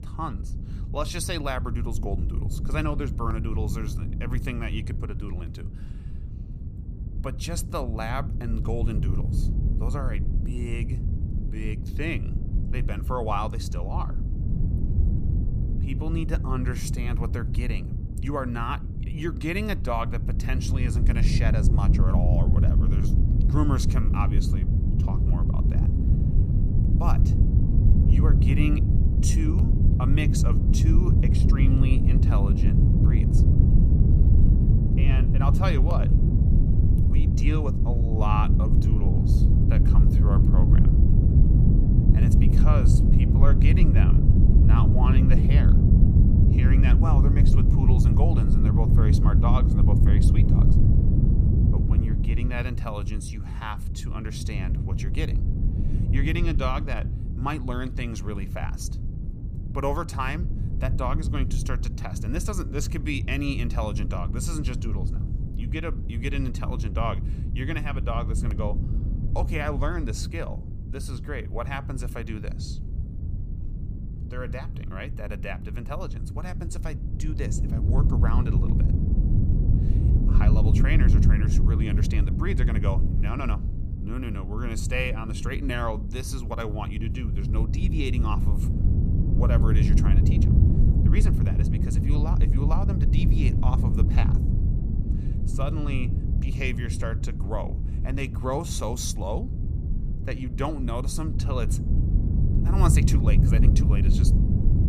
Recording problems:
low rumble; loud; throughout; 3 dB below the speech

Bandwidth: 15 kHz